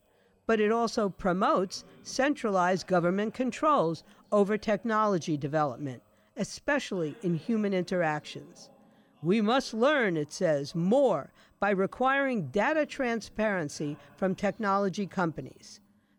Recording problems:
voice in the background; faint; throughout; 30 dB below the speech

